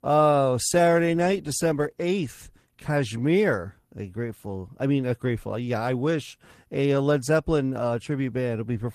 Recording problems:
garbled, watery; slightly; nothing above 14.5 kHz

